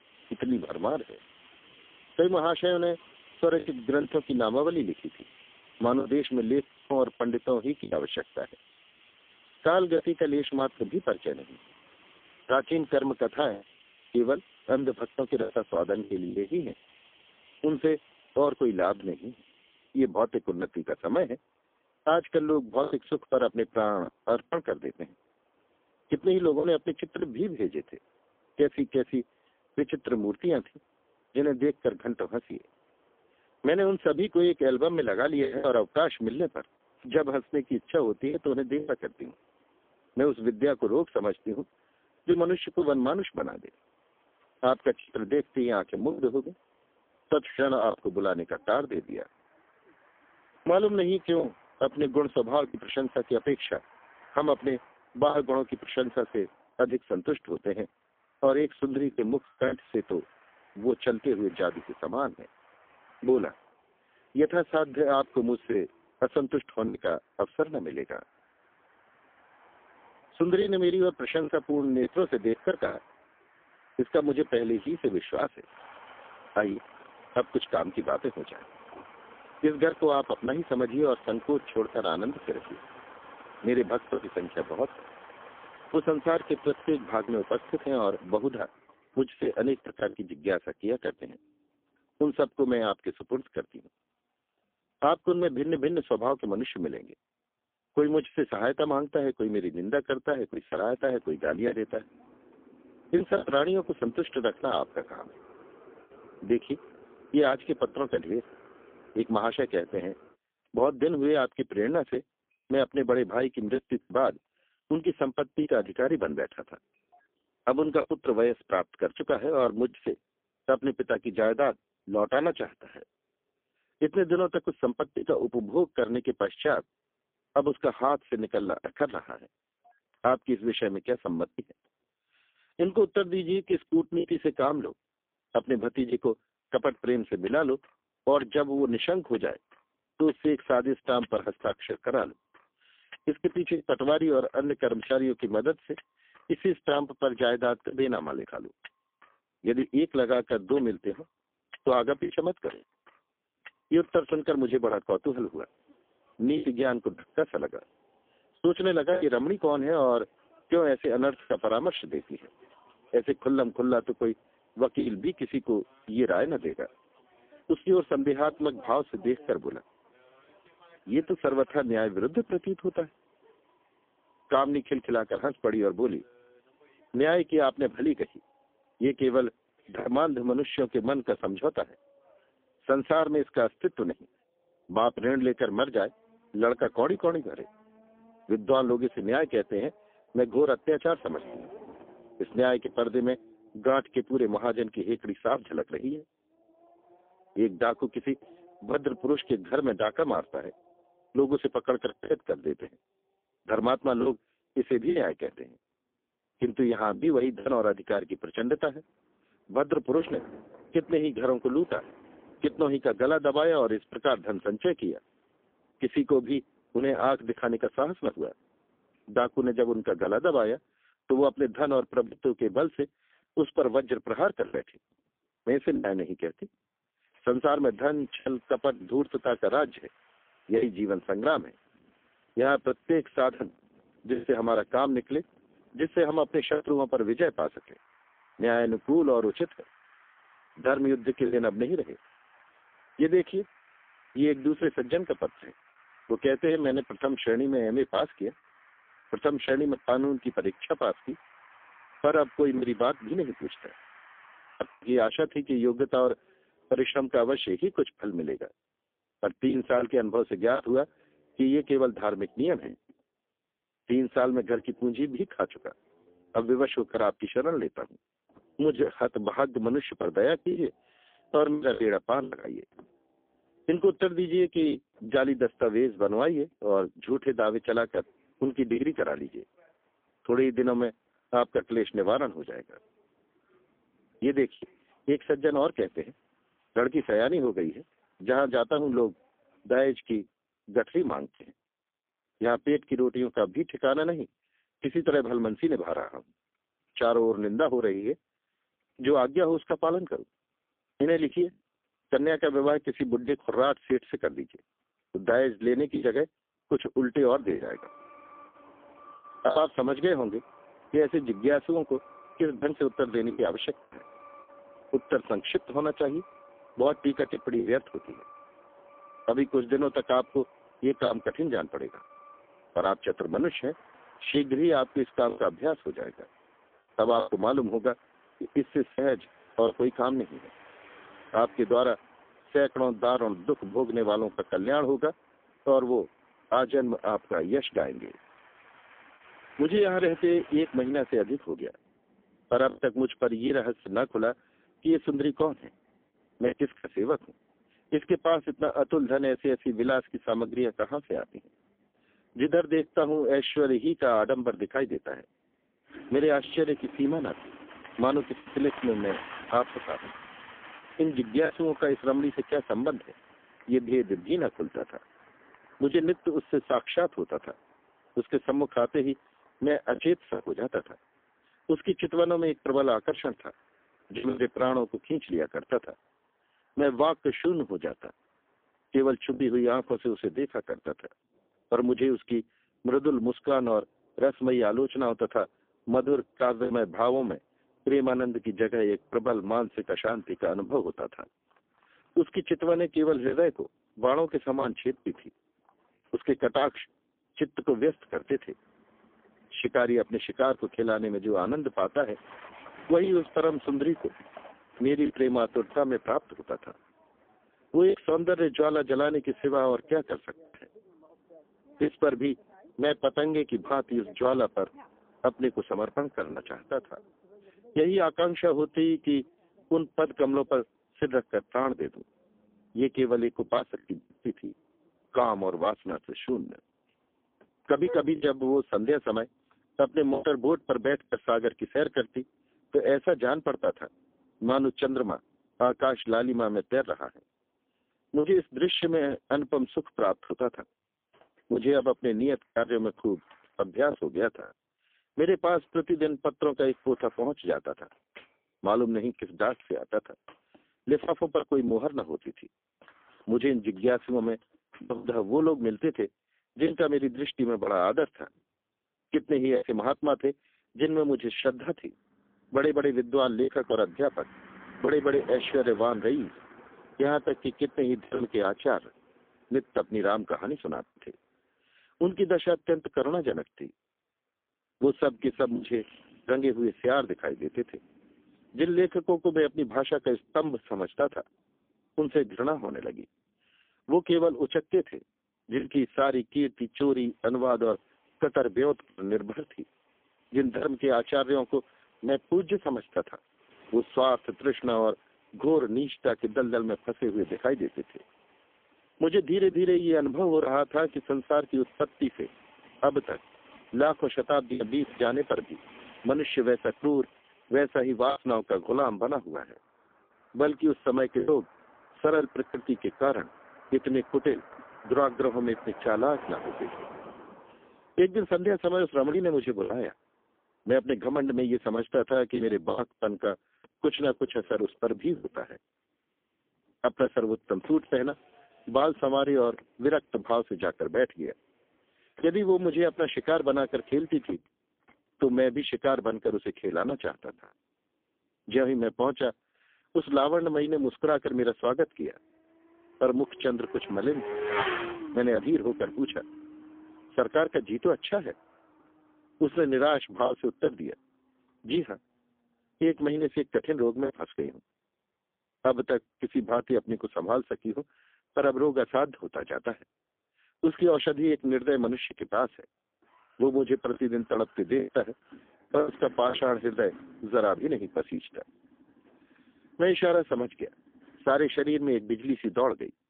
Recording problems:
phone-call audio; poor line; nothing above 3.5 kHz
traffic noise; faint; throughout; 20 dB below the speech
choppy; occasionally; 3% of the speech affected

